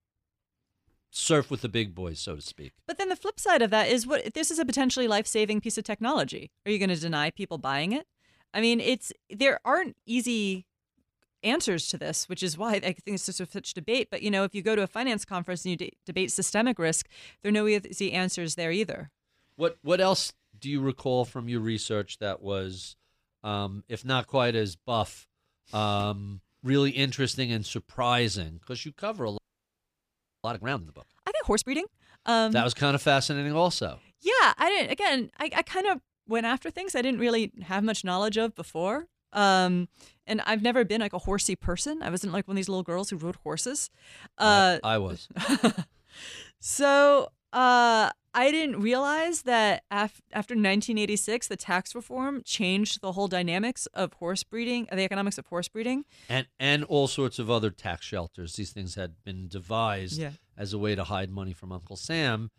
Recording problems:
audio freezing; at 29 s for 1 s

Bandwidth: 15 kHz